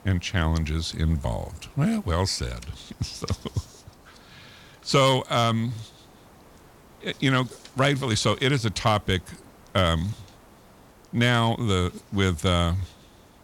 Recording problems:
hiss; faint; throughout; 25 dB below the speech

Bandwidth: 17 kHz